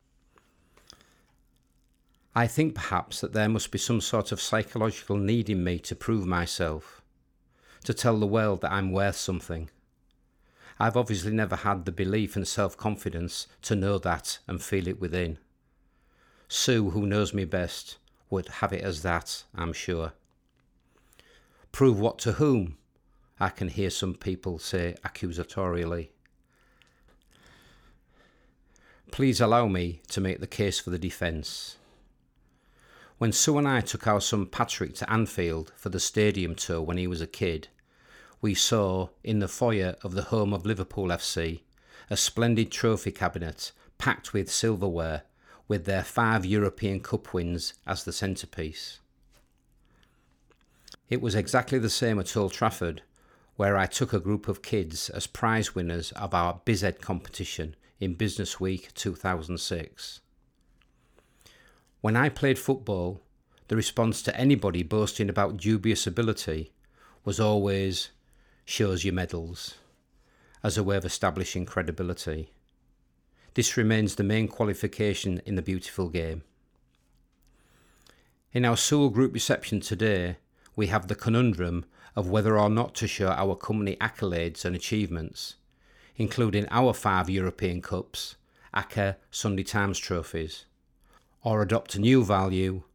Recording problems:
none

